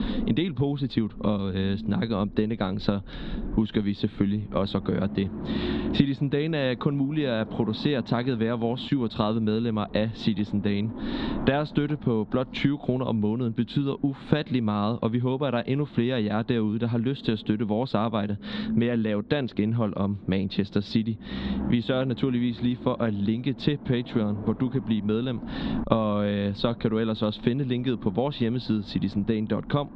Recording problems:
muffled; very slightly; fading above 4 kHz
squashed, flat; somewhat
low rumble; noticeable; throughout; 15 dB below the speech

